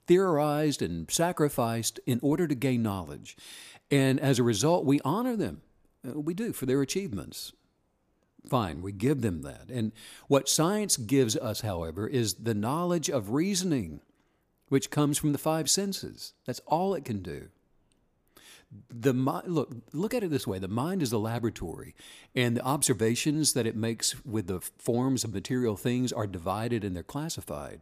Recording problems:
none

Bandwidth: 15 kHz